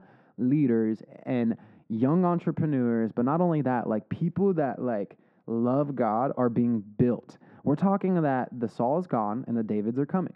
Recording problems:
muffled; very; fading above 3 kHz

